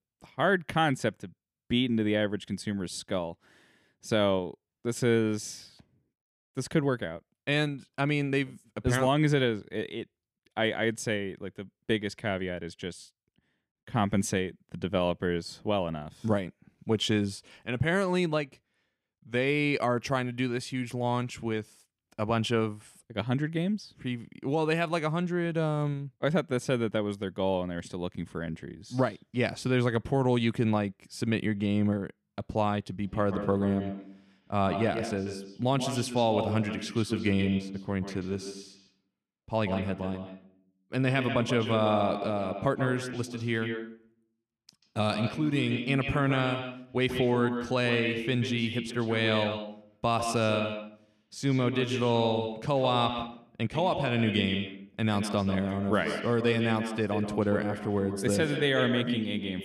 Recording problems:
echo of what is said; strong; from 33 s on; 140 ms later, 6 dB below the speech

